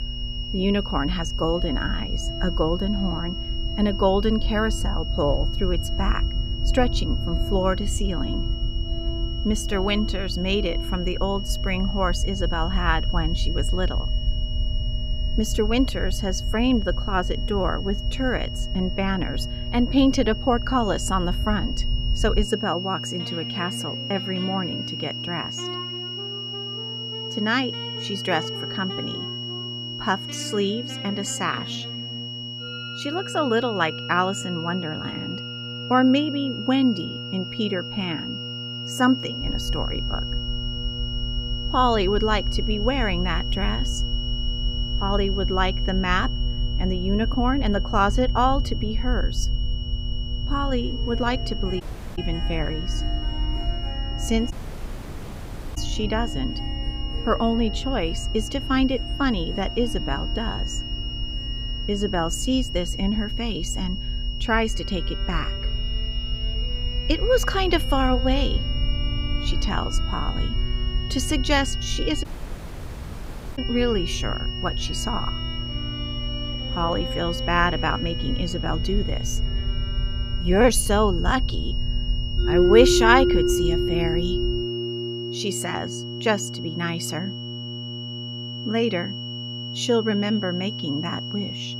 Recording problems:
high-pitched whine; loud; throughout; 3 kHz, 7 dB below the speech
background music; loud; throughout; 9 dB below the speech
electrical hum; faint; throughout; 60 Hz, 20 dB below the speech
low rumble; faint; until 22 s and from 39 s to 1:25; 25 dB below the speech
audio cutting out; at 52 s, at 55 s for 1.5 s and at 1:12 for 1.5 s

